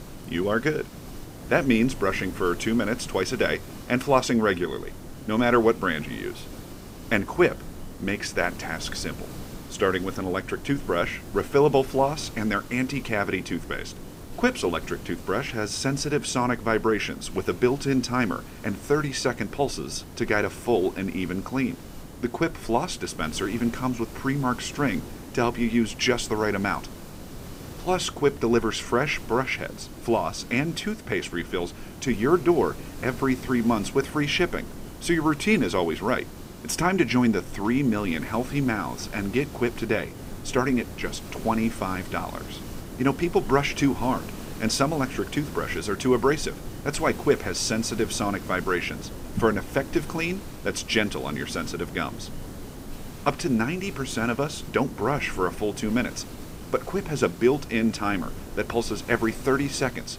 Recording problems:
hiss; noticeable; throughout; 15 dB below the speech

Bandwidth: 15.5 kHz